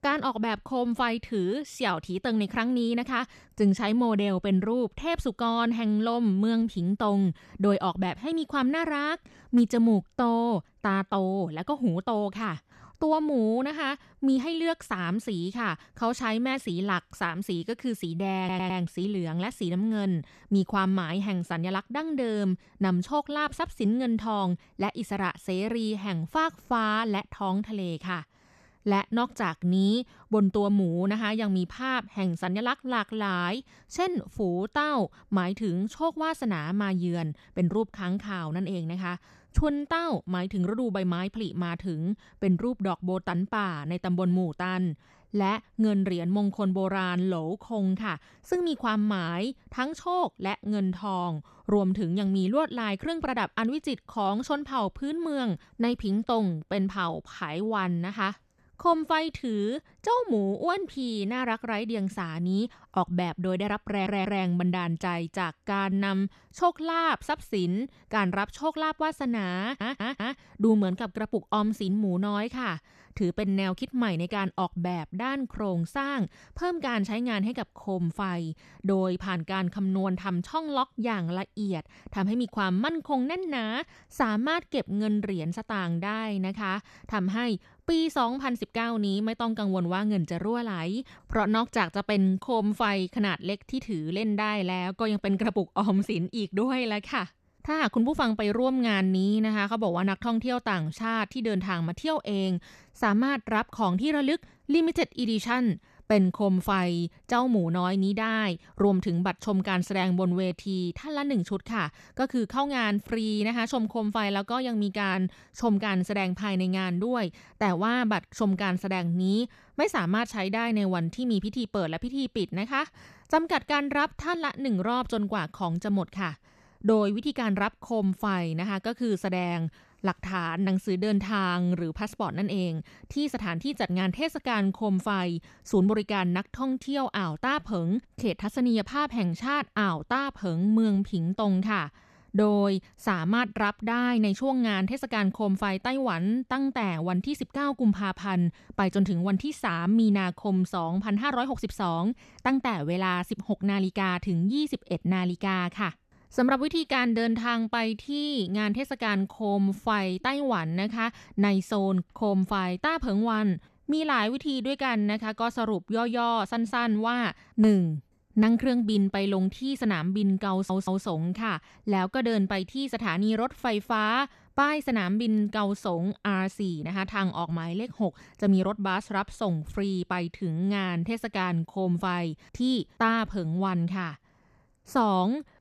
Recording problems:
audio stuttering; 4 times, first at 18 s

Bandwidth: 13.5 kHz